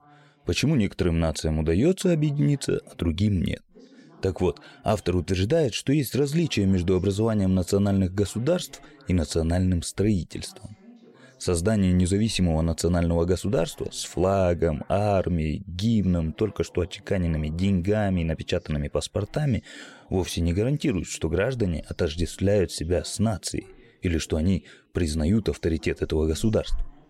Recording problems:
voice in the background; faint; throughout; 30 dB below the speech

